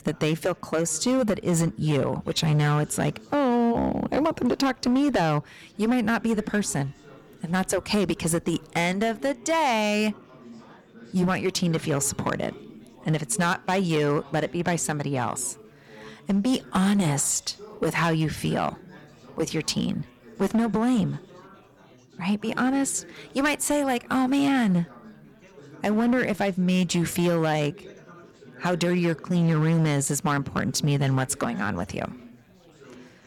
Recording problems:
distortion; slight; 8% of the sound clipped
chatter from many people; faint; throughout; 20 dB below the speech

